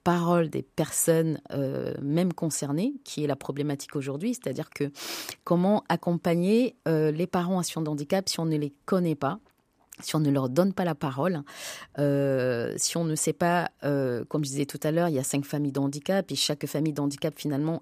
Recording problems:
none

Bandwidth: 15 kHz